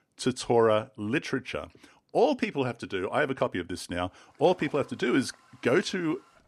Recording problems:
household noises; faint; from 4.5 s on; 25 dB below the speech

